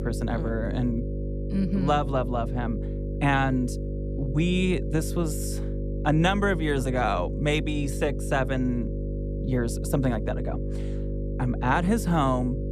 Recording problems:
electrical hum; noticeable; throughout; 50 Hz, 10 dB below the speech

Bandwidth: 14 kHz